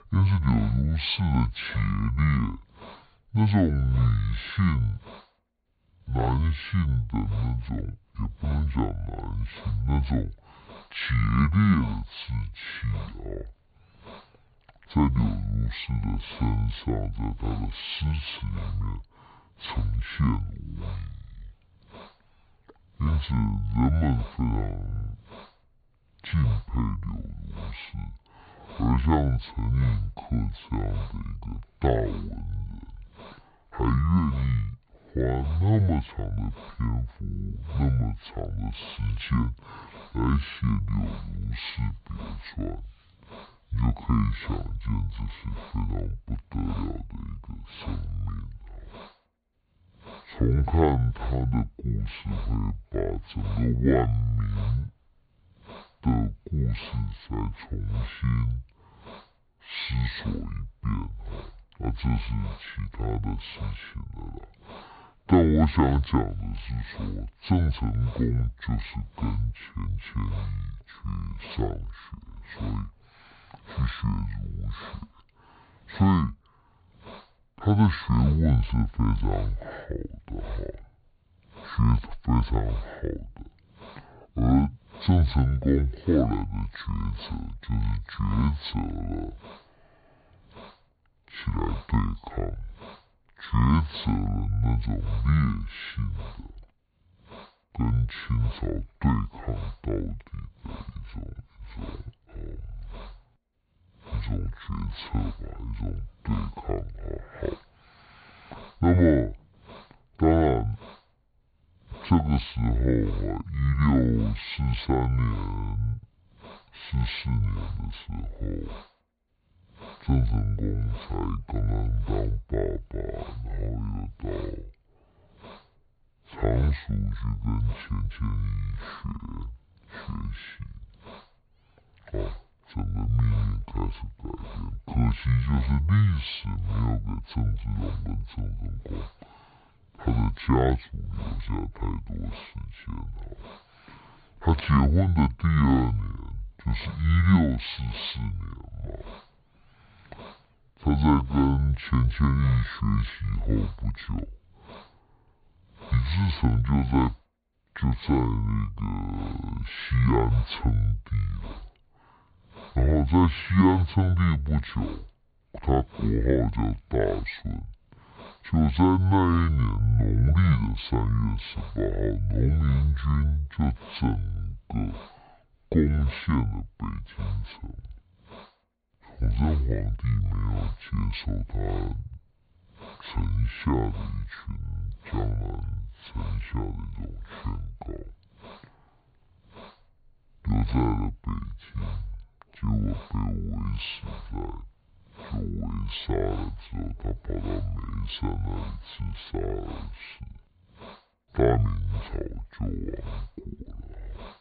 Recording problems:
high frequencies cut off; severe; nothing above 4.5 kHz
wrong speed and pitch; too slow and too low; 0.5 times normal speed
hiss; faint; throughout; 20 dB below the speech

